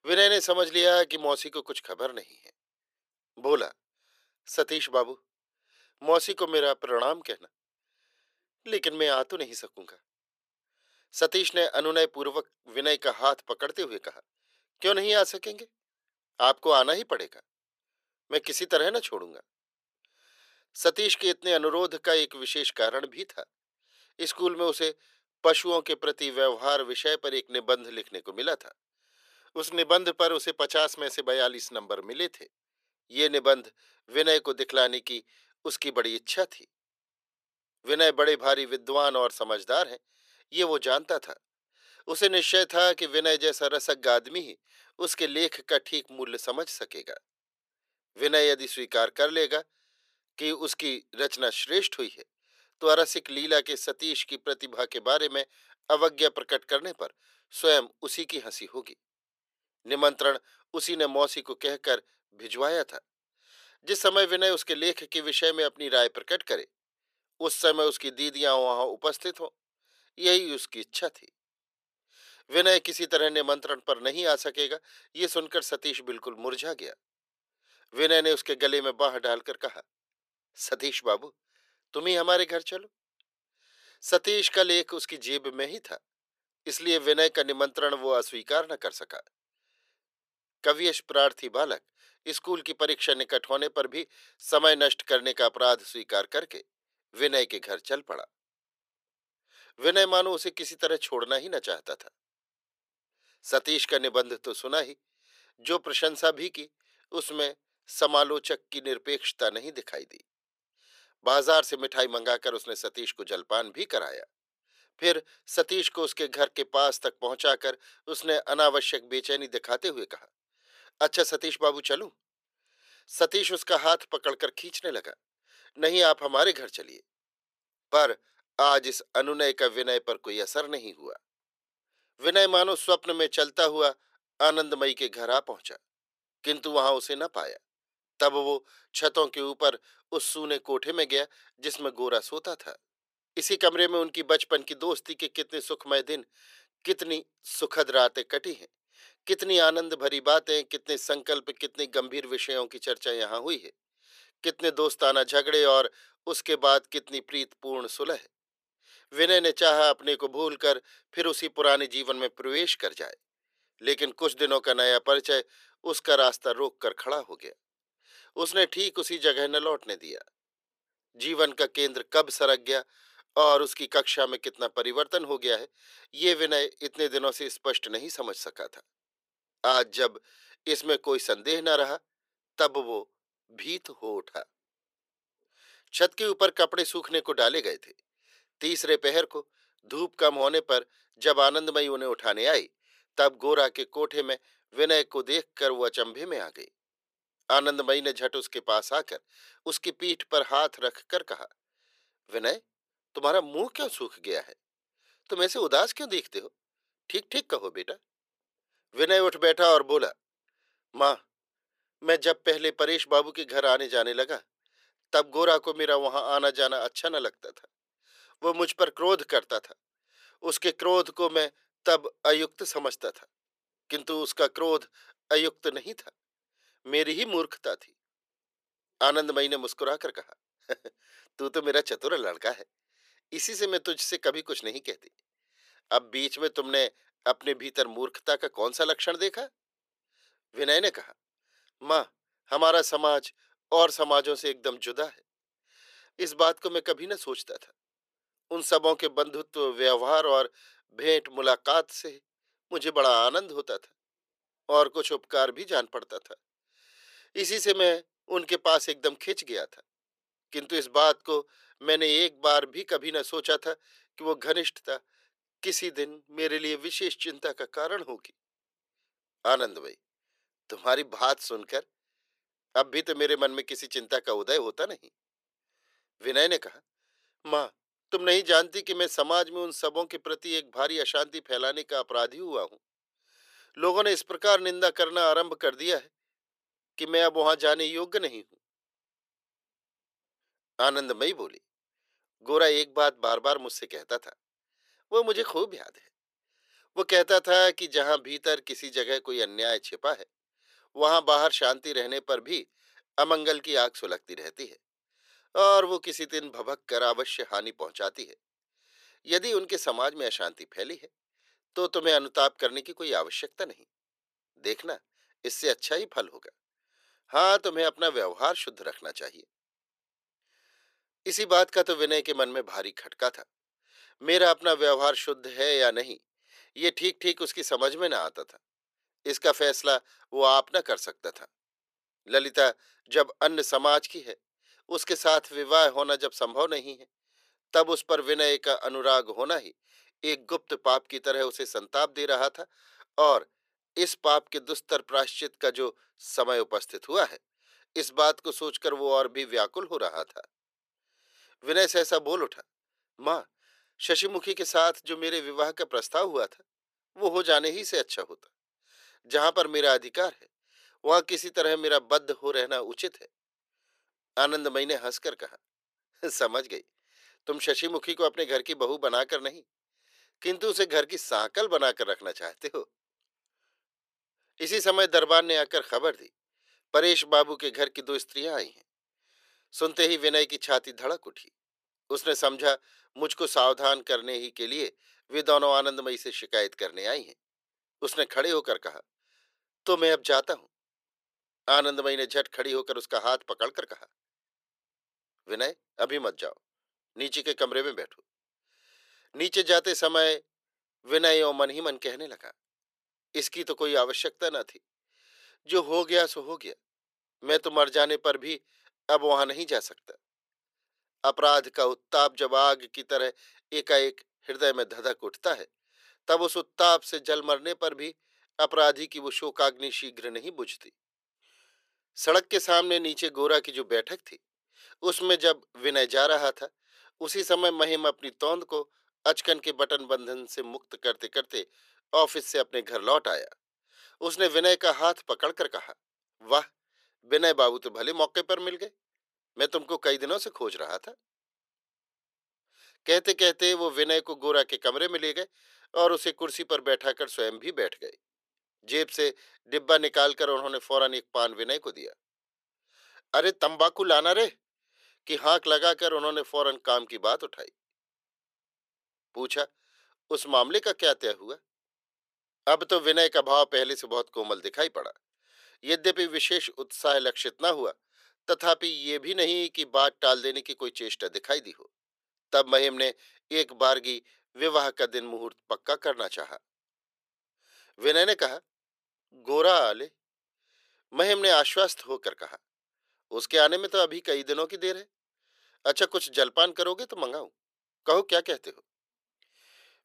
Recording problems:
thin; very; fading below 400 Hz

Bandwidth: 14.5 kHz